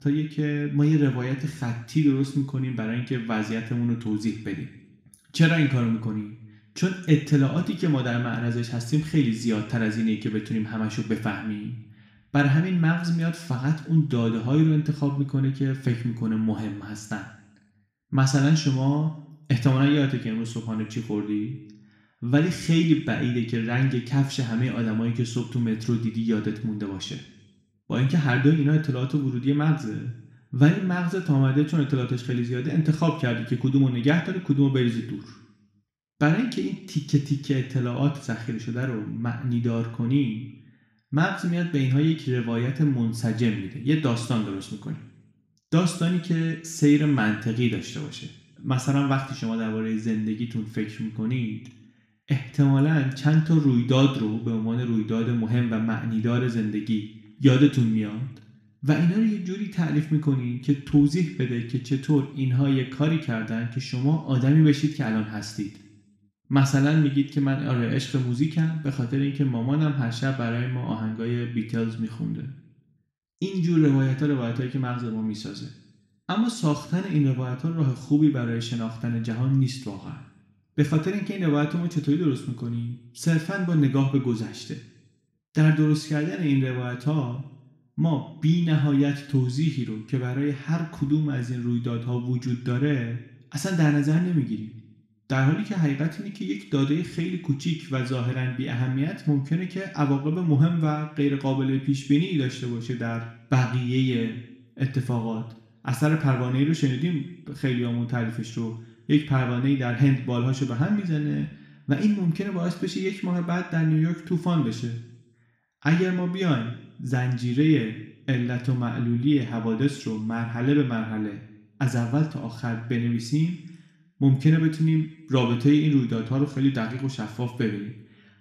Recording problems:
room echo; noticeable; dies away in 0.7 s
off-mic speech; somewhat distant

